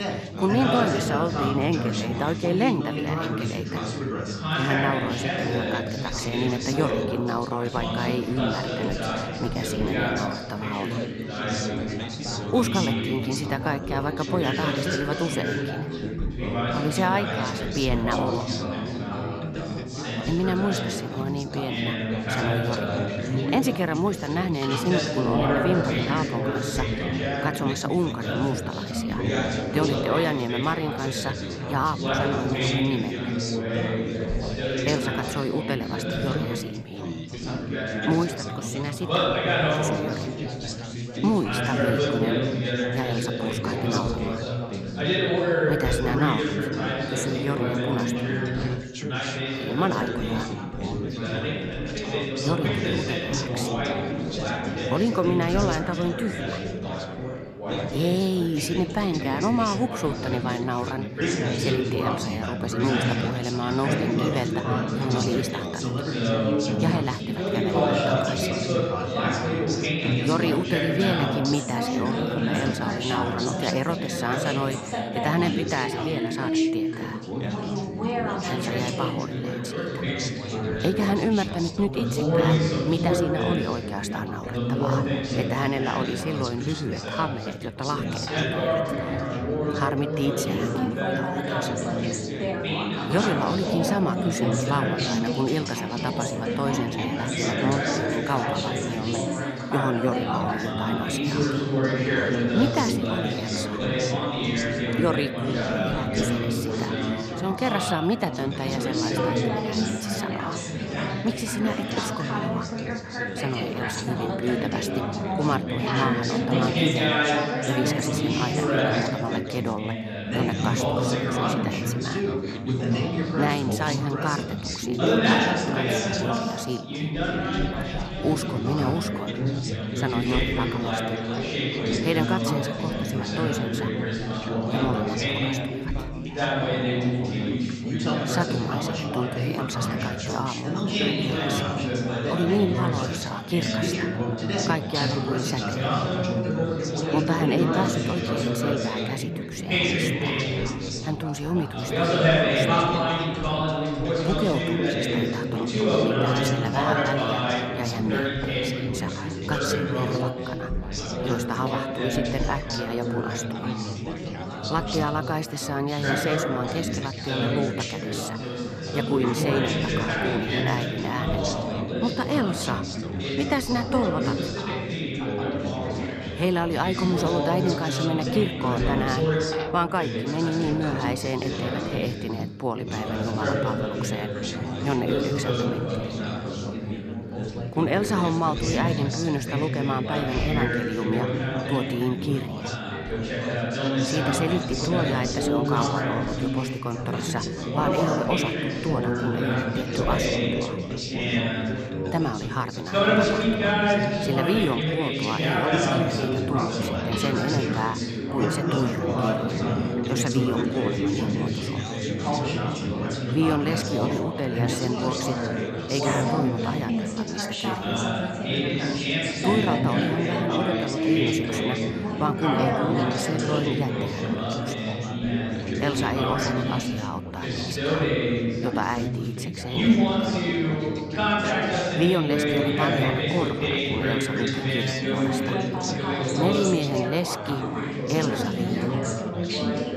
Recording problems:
chatter from many people; very loud; throughout; 2 dB above the speech

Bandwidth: 14 kHz